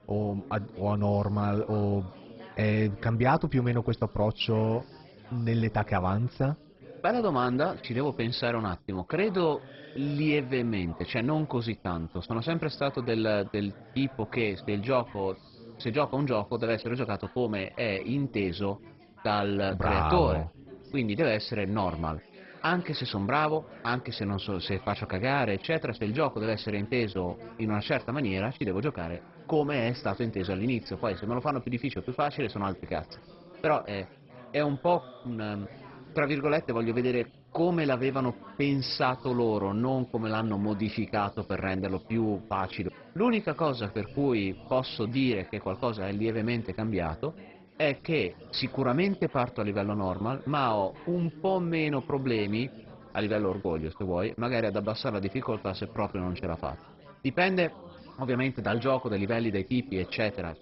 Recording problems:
garbled, watery; badly; nothing above 5.5 kHz
background chatter; noticeable; throughout; 3 voices, 20 dB below the speech

